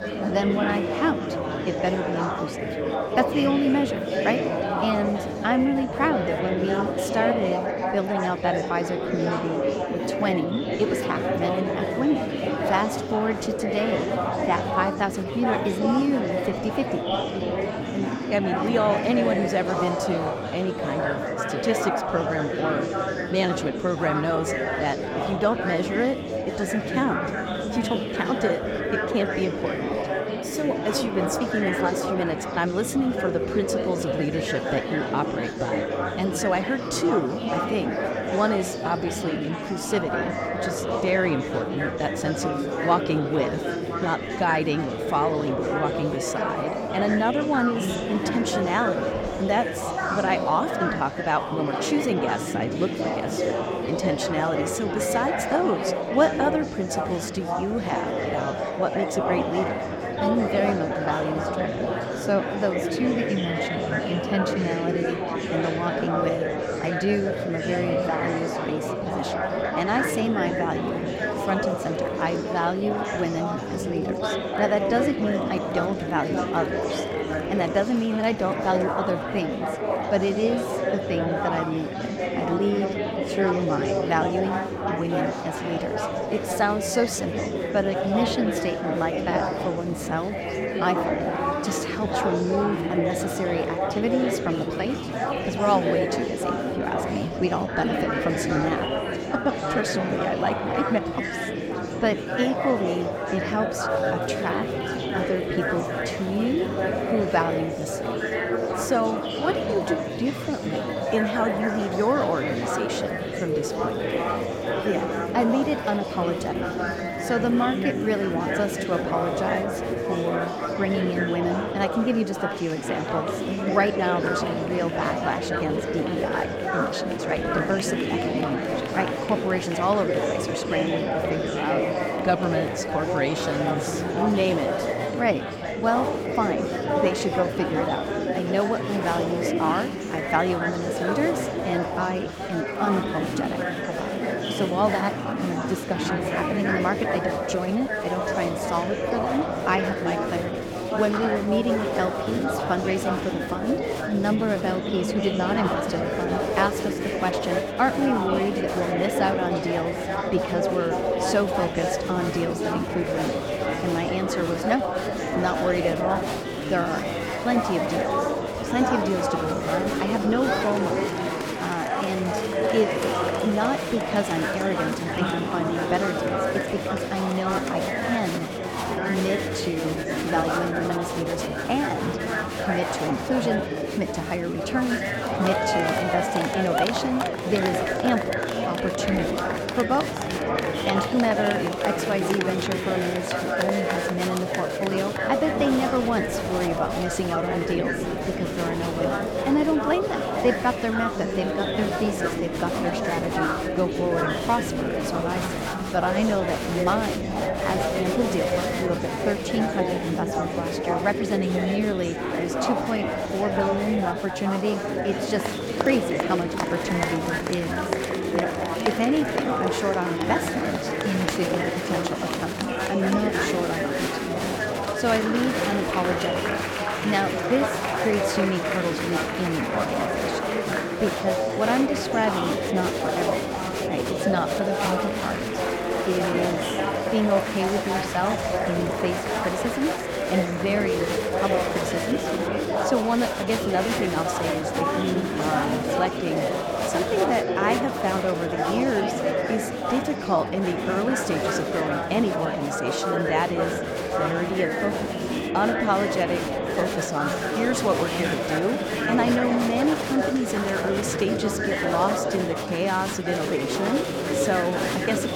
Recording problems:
murmuring crowd; very loud; throughout; as loud as the speech

